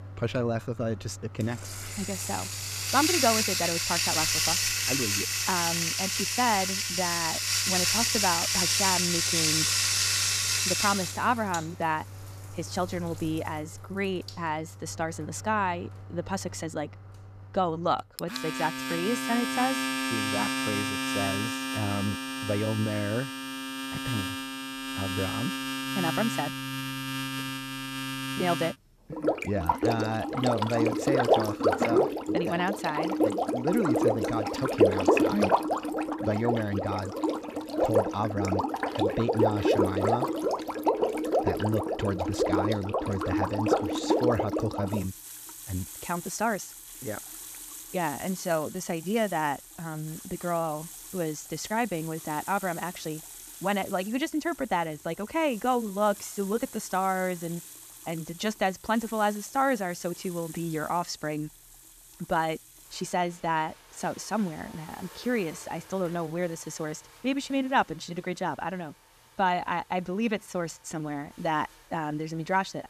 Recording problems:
household noises; very loud; throughout; 3 dB above the speech

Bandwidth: 14.5 kHz